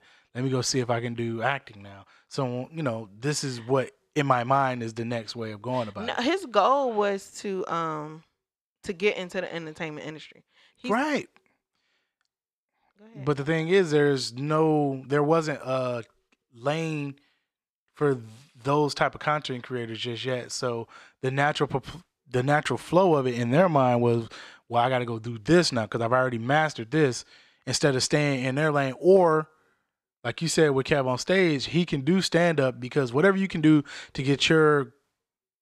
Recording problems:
none

